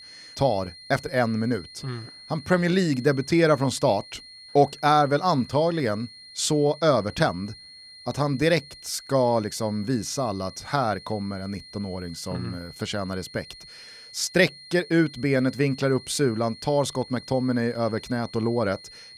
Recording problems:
high-pitched whine; noticeable; throughout; 4 kHz, 20 dB below the speech

